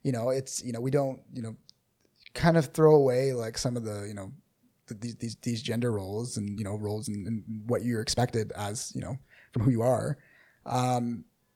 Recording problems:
uneven, jittery; strongly; from 0.5 to 11 s

